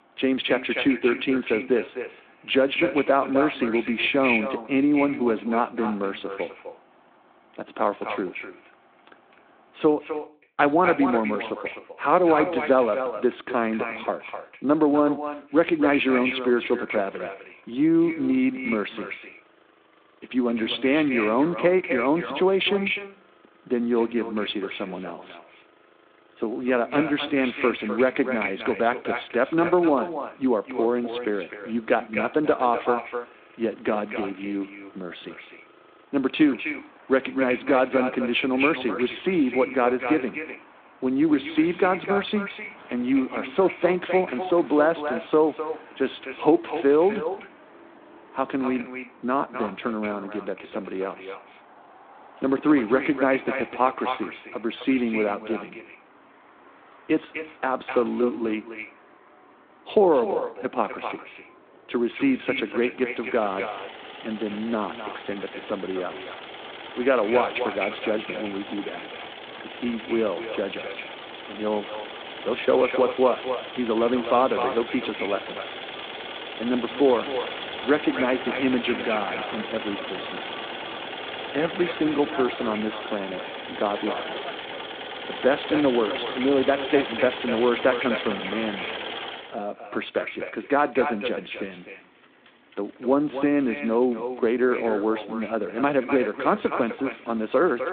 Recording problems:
echo of what is said; strong; throughout; 250 ms later, 8 dB below the speech
phone-call audio
traffic noise; noticeable; throughout; 10 dB below the speech

